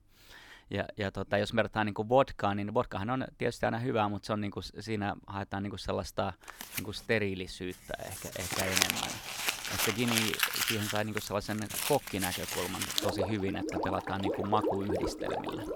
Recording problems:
household noises; very loud; from 6.5 s on; 1 dB above the speech

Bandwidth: 18.5 kHz